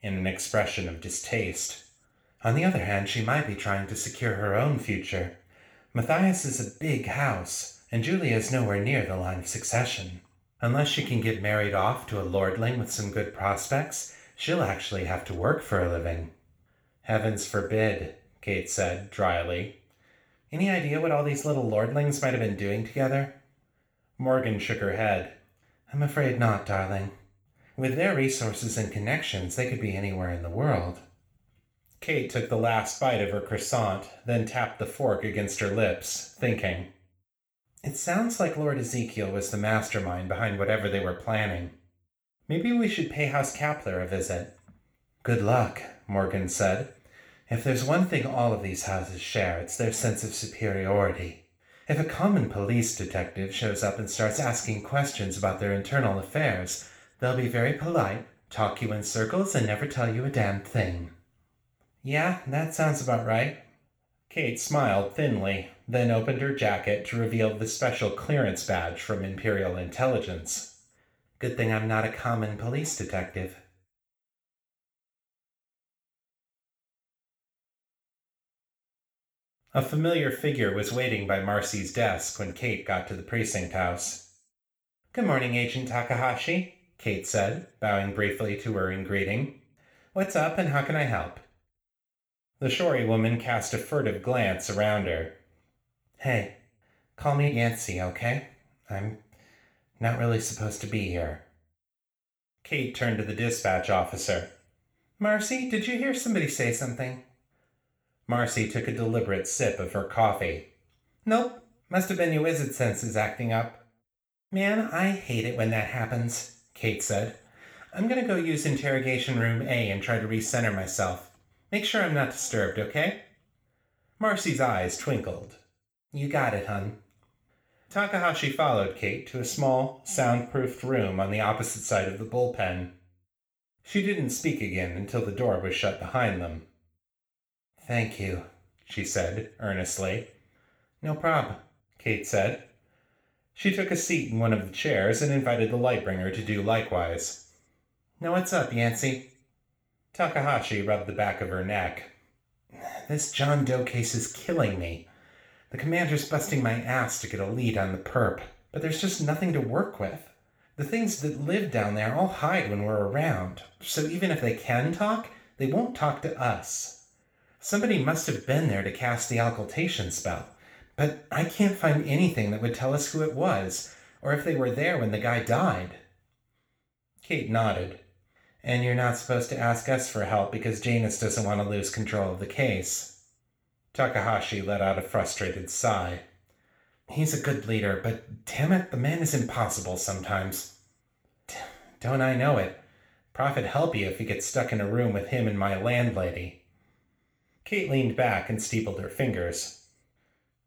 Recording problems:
room echo; slight; dies away in 0.4 s
off-mic speech; somewhat distant

